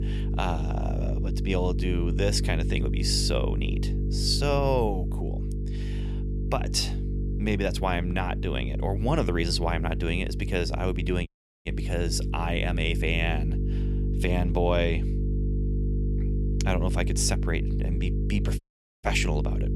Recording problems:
electrical hum; noticeable; throughout; 50 Hz, 10 dB below the speech
audio cutting out; at 11 s and at 19 s

